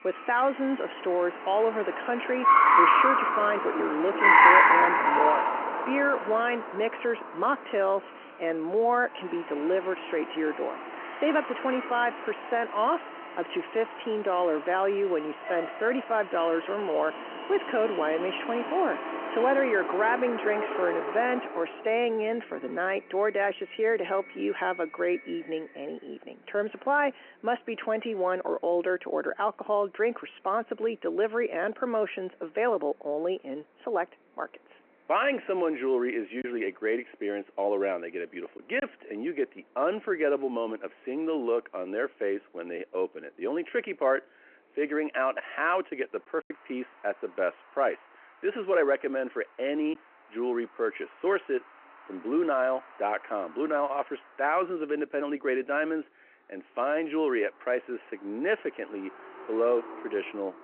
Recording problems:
phone-call audio
traffic noise; very loud; throughout; 3 dB above the speech
choppy; occasionally; from 36 to 39 s and from 46 to 50 s; 2% of the speech affected

